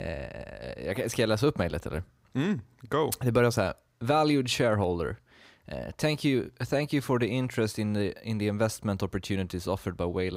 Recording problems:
abrupt cut into speech; at the start and the end

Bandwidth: 15.5 kHz